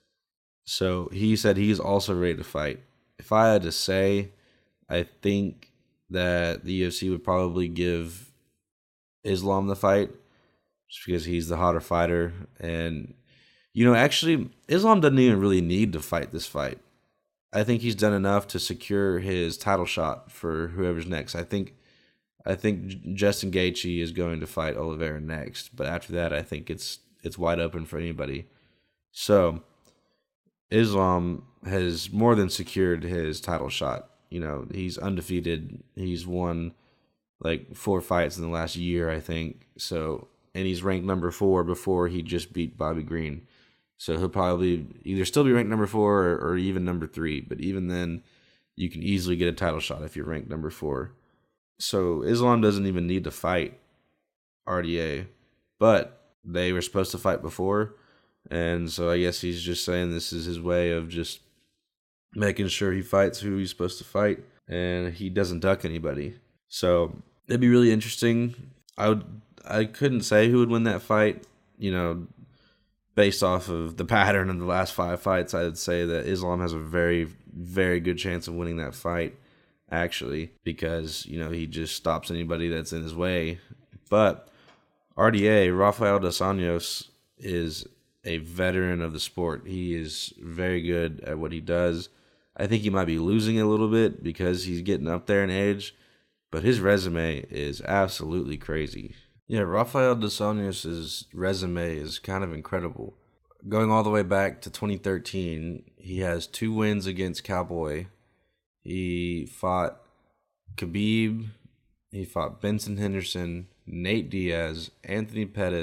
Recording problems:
abrupt cut into speech; at the end

